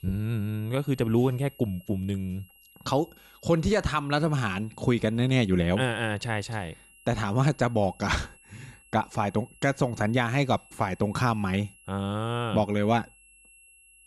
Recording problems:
high-pitched whine; faint; throughout; 3 kHz, 25 dB below the speech

